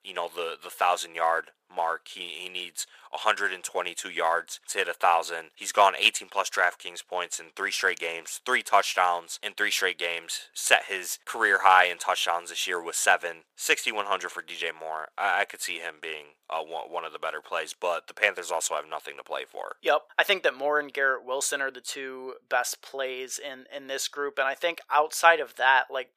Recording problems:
thin; very; fading below 550 Hz

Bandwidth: 15 kHz